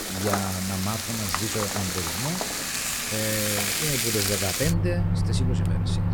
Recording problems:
household noises; very loud; throughout; 5 dB above the speech

